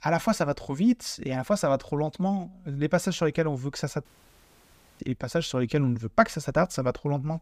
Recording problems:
audio cutting out; at 4 s for 1 s

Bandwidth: 15 kHz